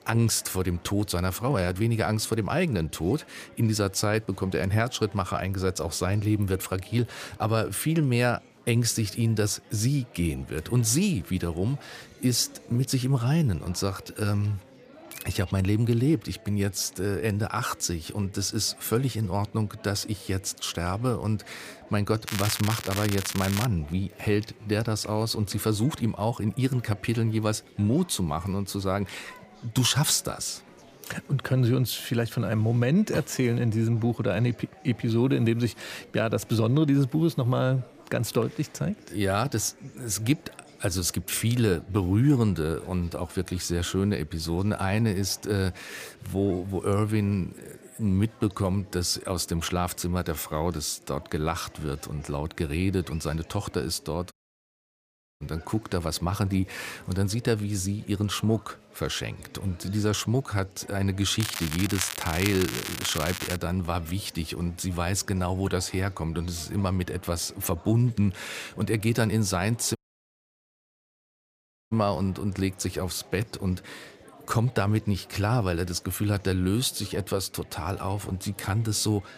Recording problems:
crackling; loud; from 22 to 24 s and from 1:01 to 1:04; 5 dB below the speech
chatter from many people; faint; throughout; 25 dB below the speech
audio cutting out; at 54 s for 1 s and at 1:10 for 2 s

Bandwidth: 15 kHz